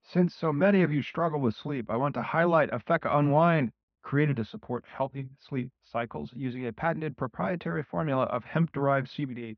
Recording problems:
muffled; very slightly; fading above 2.5 kHz
high frequencies cut off; slight; nothing above 6 kHz

